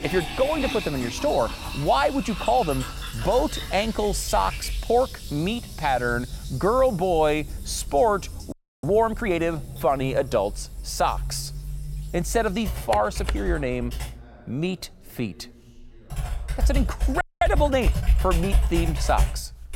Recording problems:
household noises; loud; throughout; 6 dB below the speech
background chatter; faint; throughout; 3 voices, 30 dB below the speech
audio freezing; at 8.5 s and at 17 s

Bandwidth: 16.5 kHz